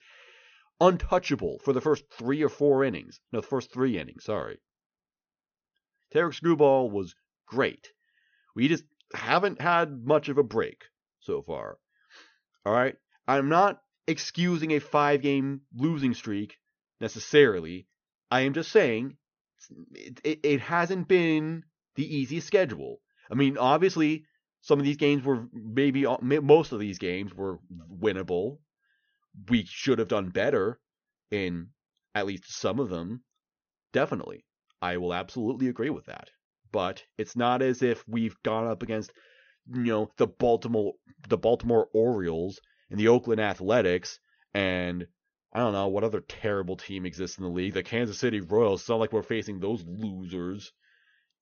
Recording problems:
high frequencies cut off; noticeable; nothing above 6.5 kHz

